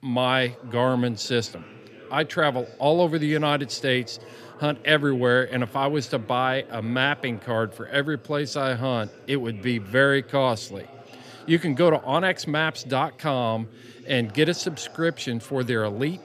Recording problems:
background chatter; faint; throughout; 3 voices, 20 dB below the speech

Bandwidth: 15 kHz